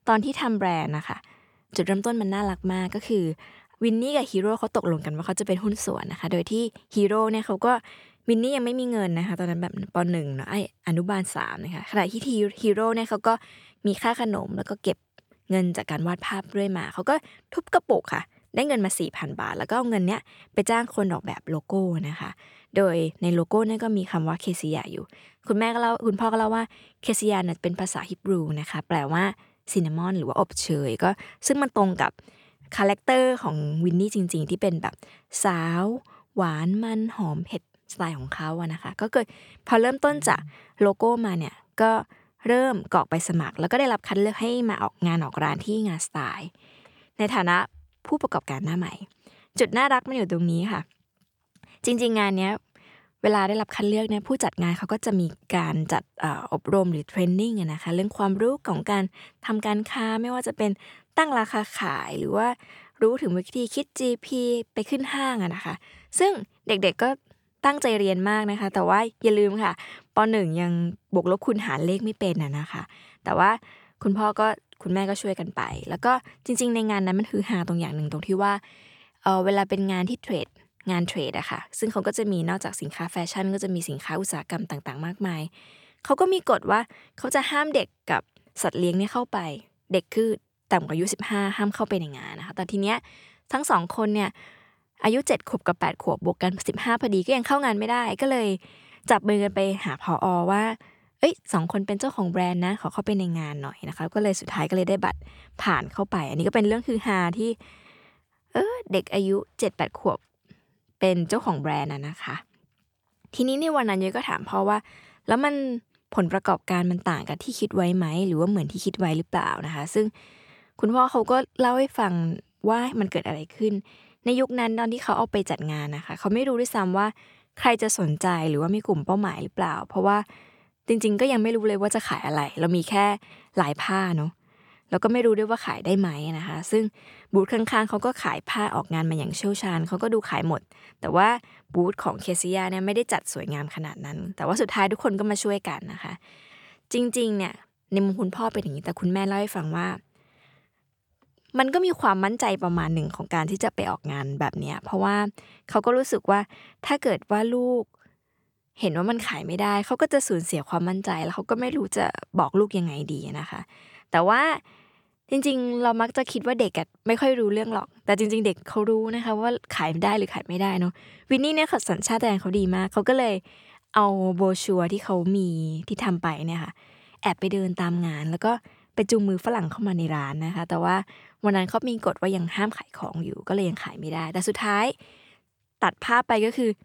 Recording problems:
none

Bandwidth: 18.5 kHz